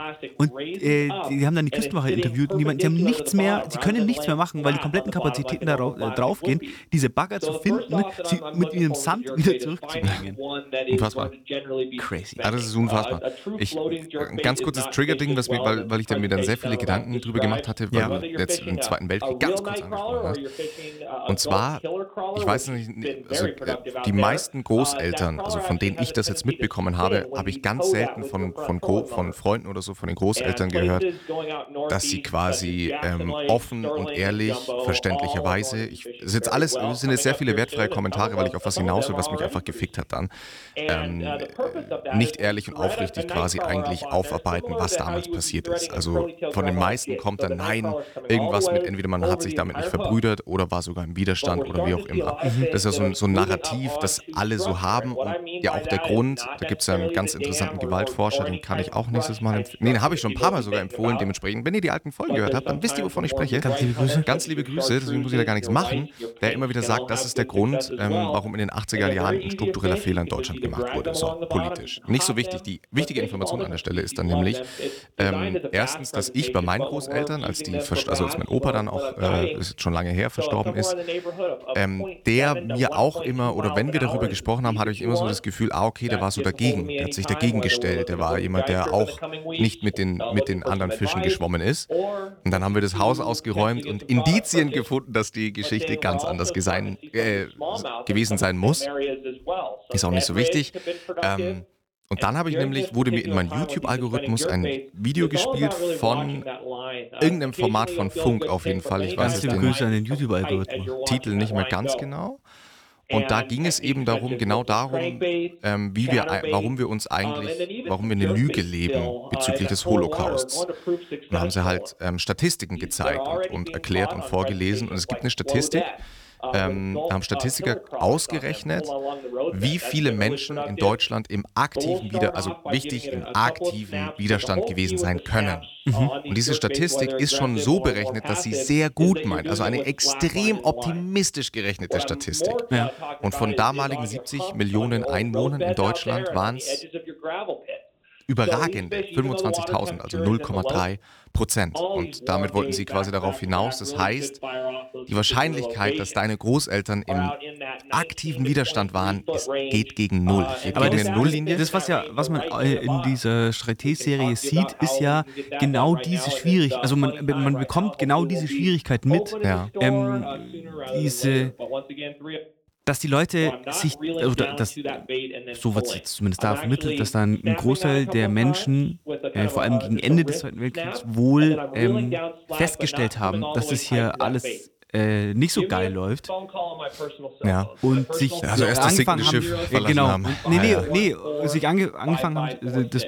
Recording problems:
voice in the background; loud; throughout; 6 dB below the speech

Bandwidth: 18.5 kHz